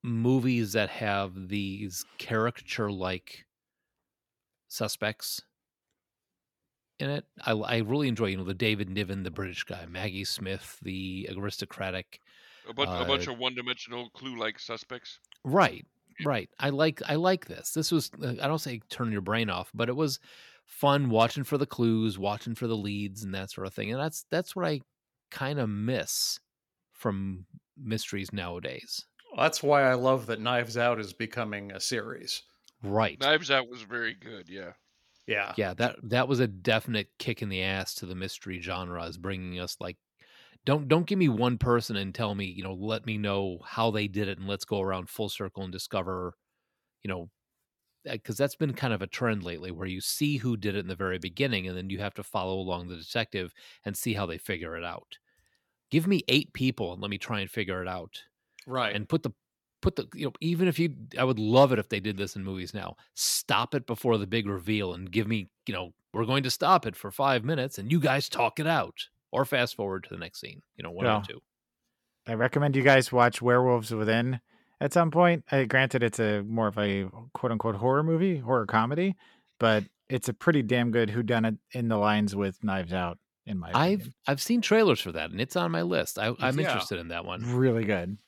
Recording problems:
none

